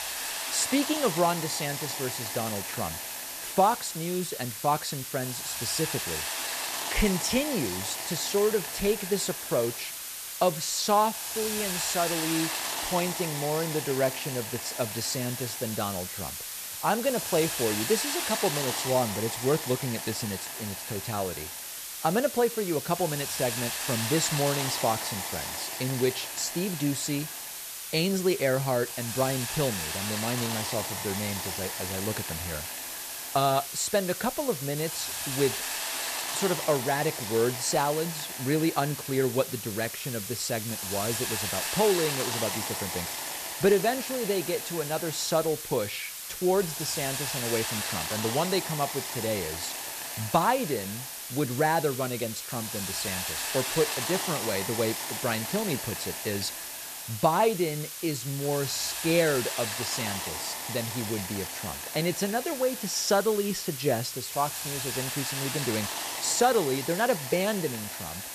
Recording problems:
hiss; loud; throughout; 3 dB below the speech

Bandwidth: 14.5 kHz